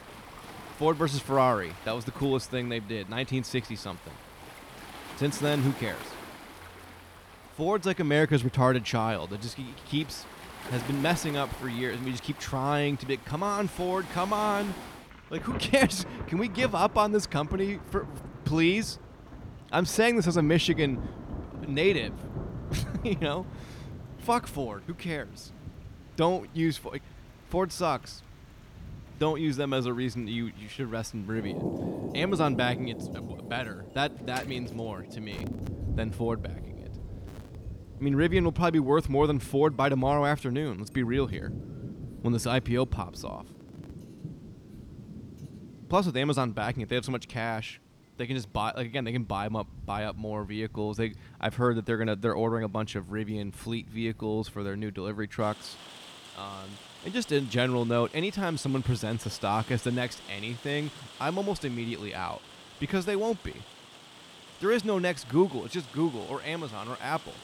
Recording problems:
rain or running water; noticeable; throughout; 15 dB below the speech

